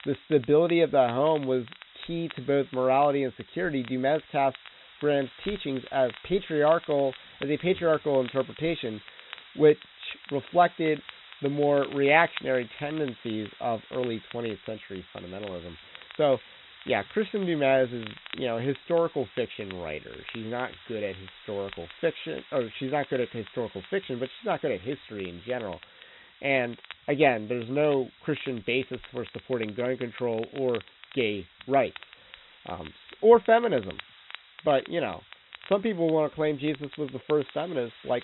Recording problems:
high frequencies cut off; severe; nothing above 4 kHz
crackle, like an old record; noticeable; 20 dB below the speech
hiss; faint; throughout; 20 dB below the speech

